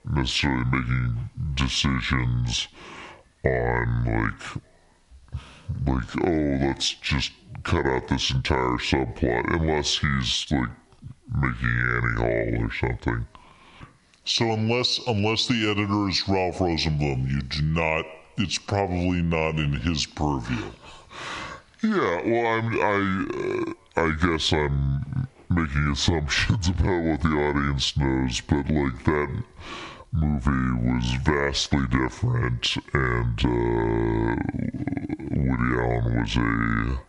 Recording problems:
squashed, flat; heavily
wrong speed and pitch; too slow and too low; 0.7 times normal speed

